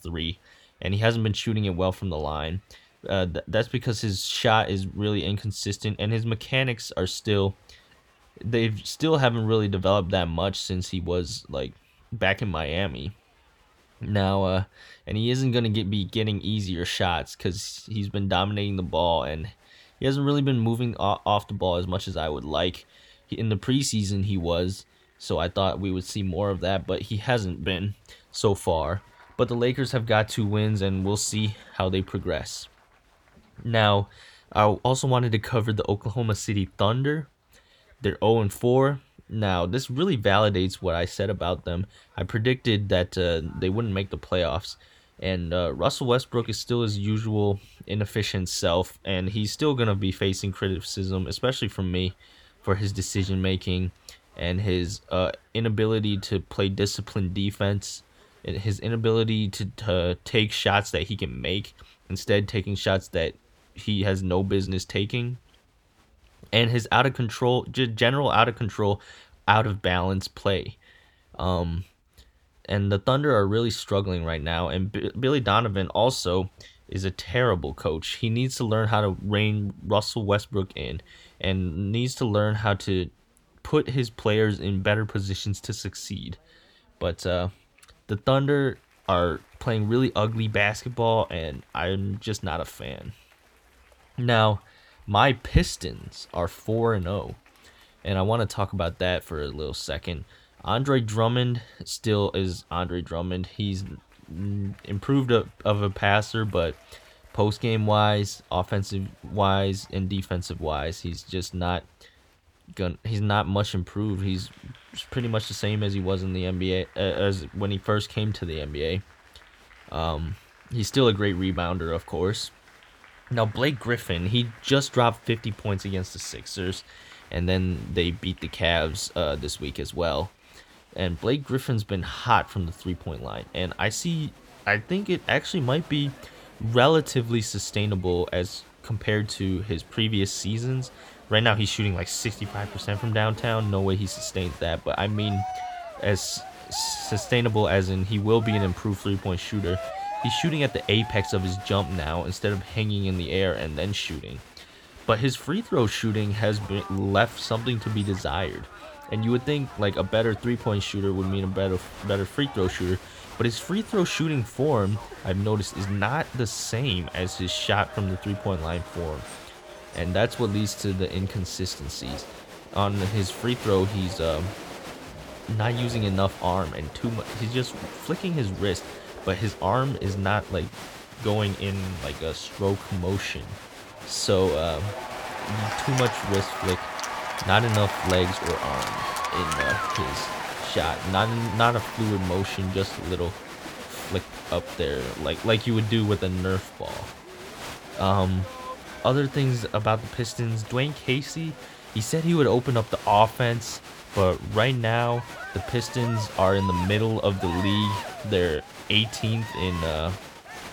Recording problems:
crowd noise; noticeable; throughout; 10 dB below the speech

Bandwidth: 18.5 kHz